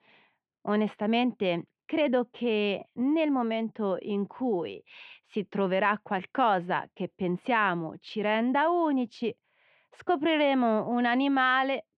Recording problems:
muffled; very; fading above 3 kHz

